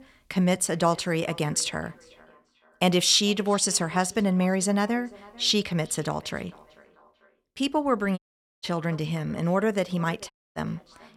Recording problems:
echo of what is said; faint; throughout; 440 ms later, 25 dB below the speech
audio cutting out; at 8 s and at 10 s

